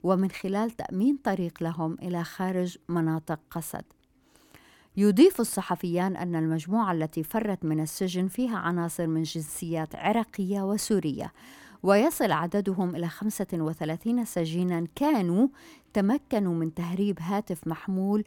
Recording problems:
none

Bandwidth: 17 kHz